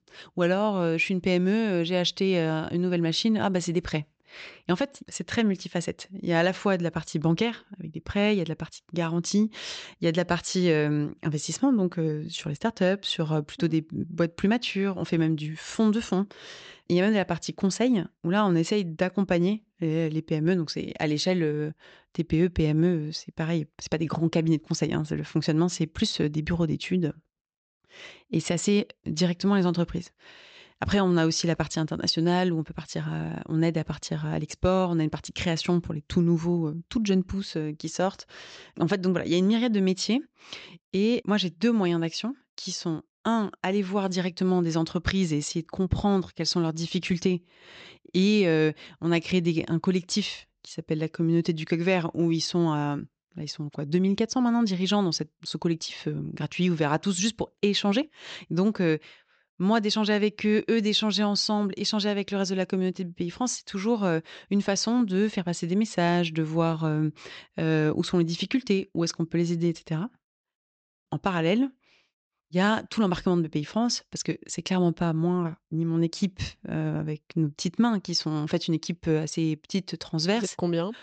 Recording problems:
high frequencies cut off; noticeable; nothing above 8 kHz

